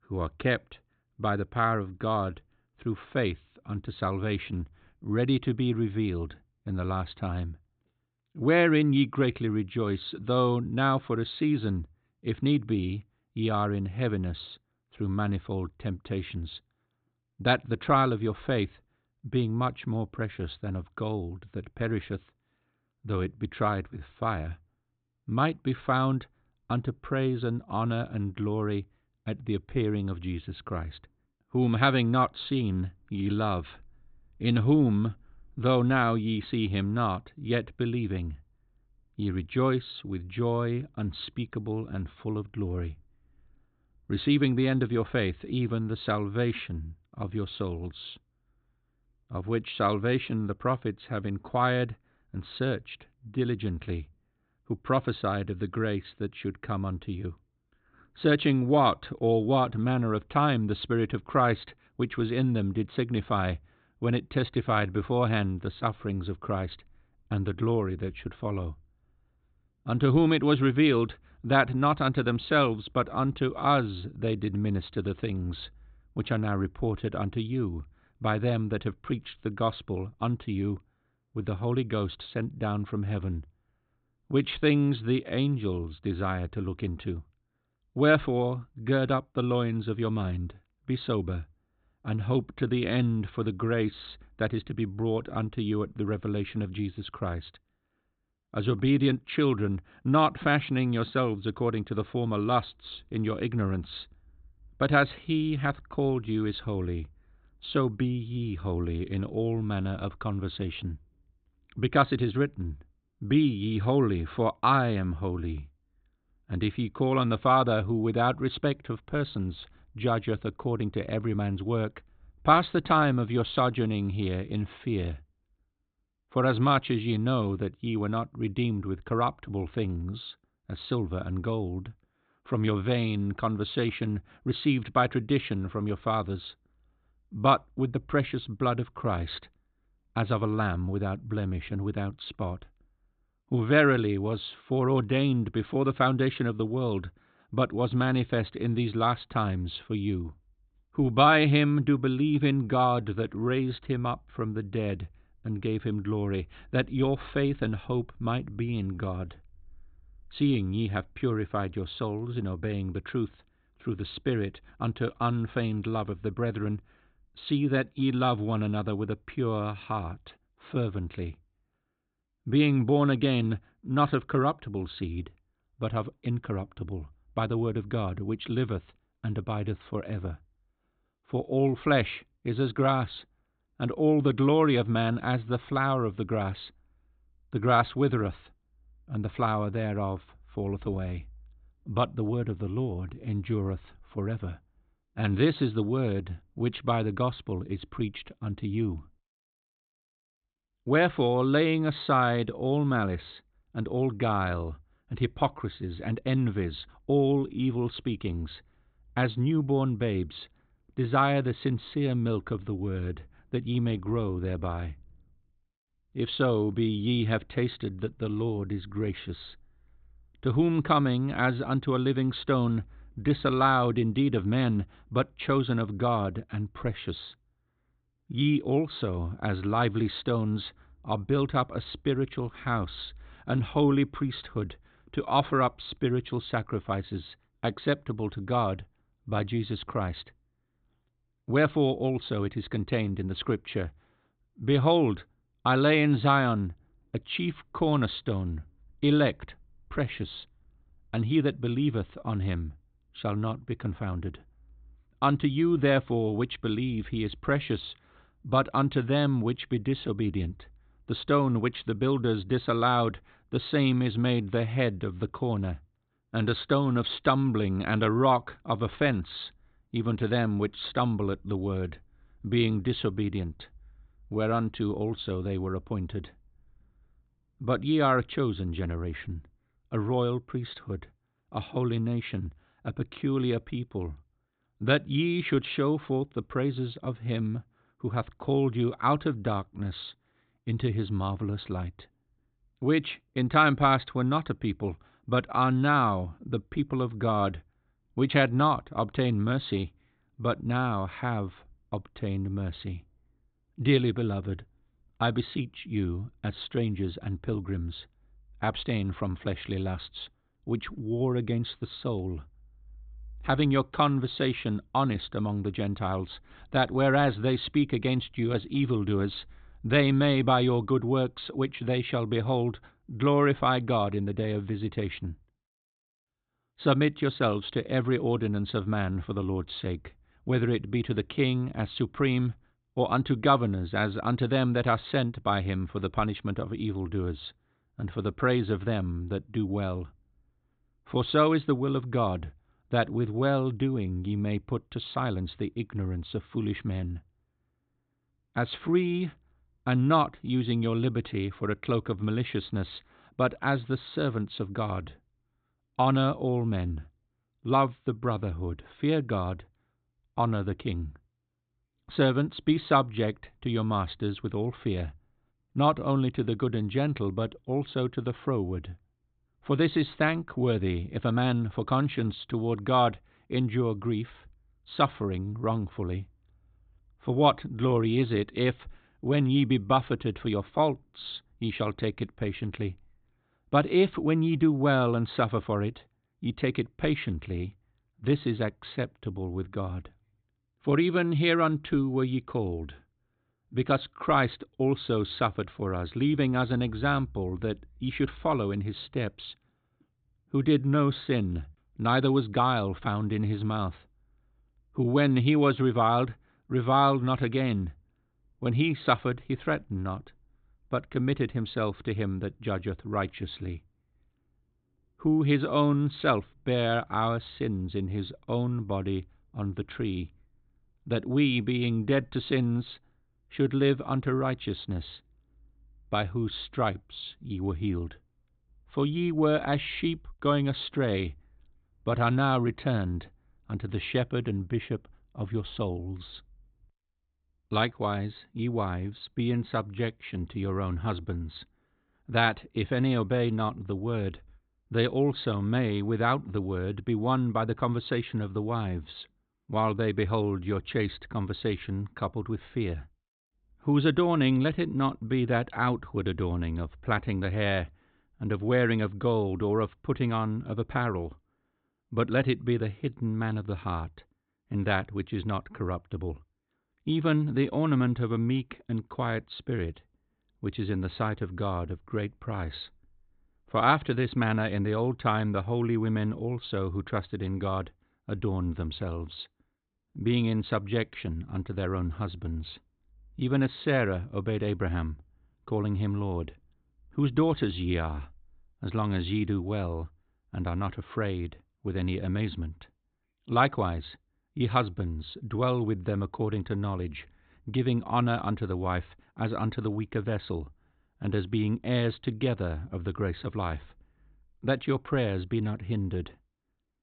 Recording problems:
high frequencies cut off; severe; nothing above 4 kHz

